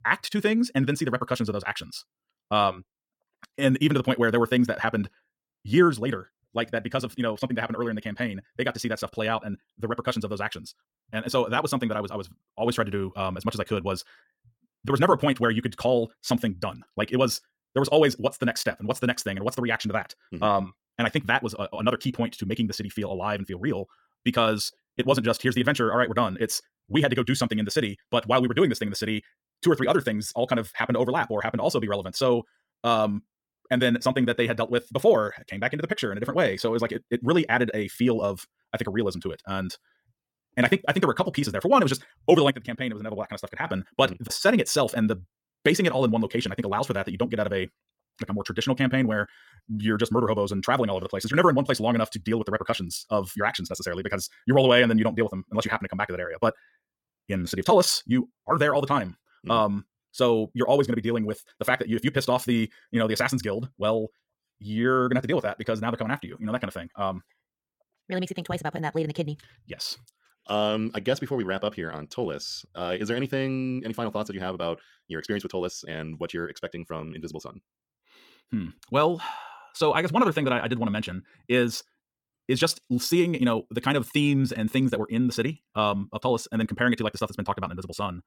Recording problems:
wrong speed, natural pitch; too fast; 1.8 times normal speed

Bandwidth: 17 kHz